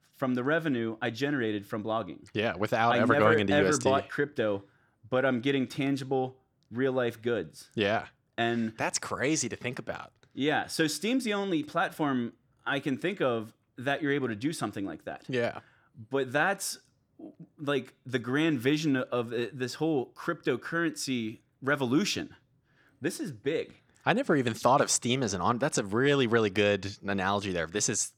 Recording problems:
none

